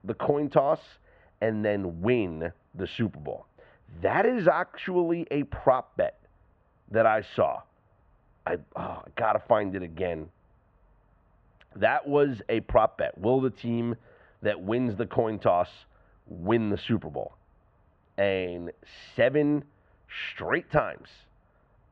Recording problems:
muffled; very; fading above 2.5 kHz

